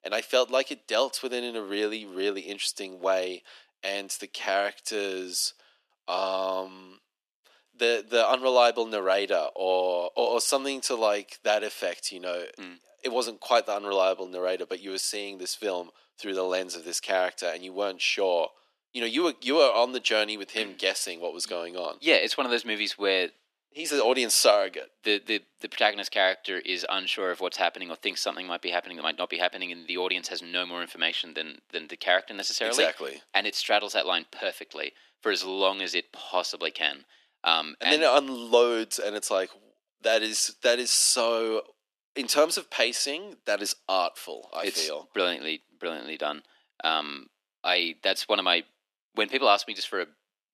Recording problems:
thin; very; fading below 300 Hz

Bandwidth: 13.5 kHz